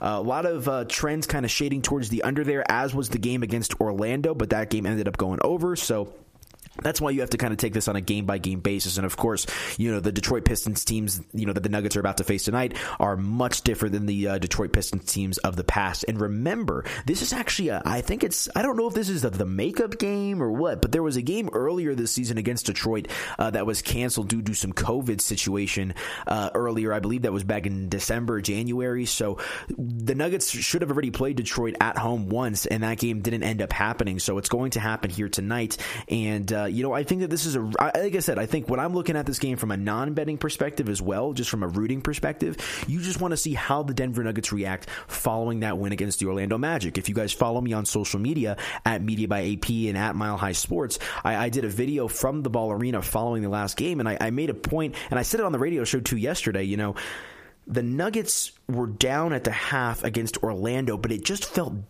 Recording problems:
squashed, flat; heavily

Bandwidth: 15 kHz